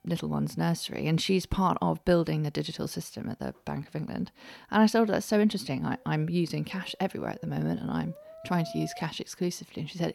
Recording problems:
background music; noticeable; throughout; 20 dB below the speech

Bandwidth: 17.5 kHz